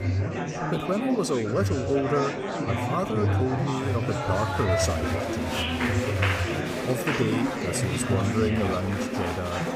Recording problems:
chatter from many people; very loud; throughout; 1 dB above the speech

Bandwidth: 15.5 kHz